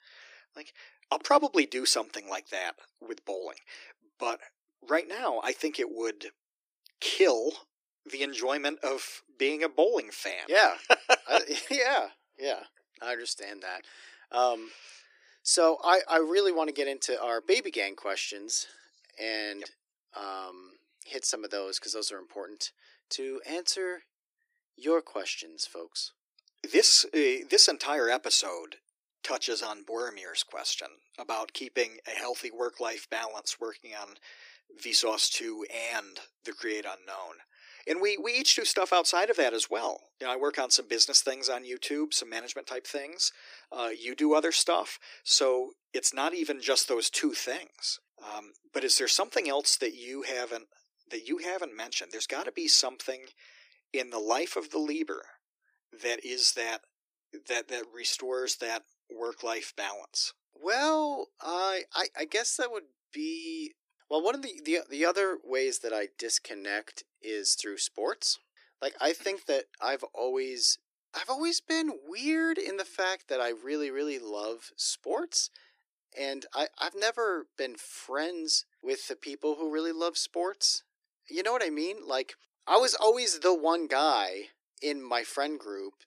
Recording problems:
thin; very; fading below 300 Hz

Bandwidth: 15 kHz